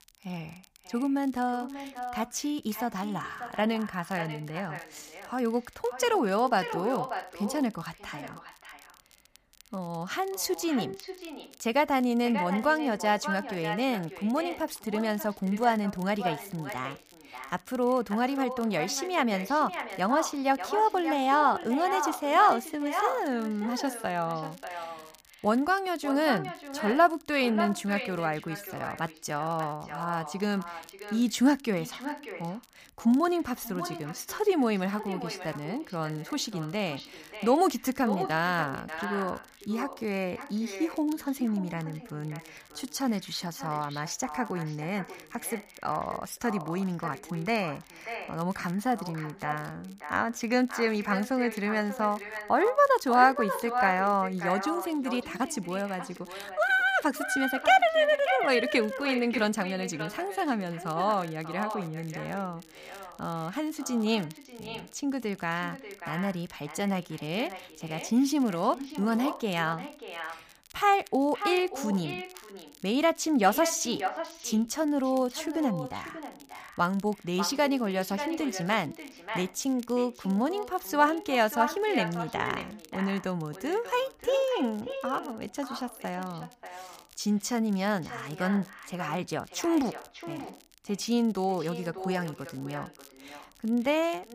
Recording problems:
echo of what is said; strong; throughout; 590 ms later, 10 dB below the speech
crackle, like an old record; faint; 25 dB below the speech

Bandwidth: 15 kHz